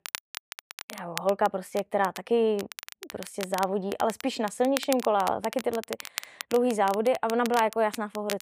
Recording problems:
crackle, like an old record; noticeable; 15 dB below the speech

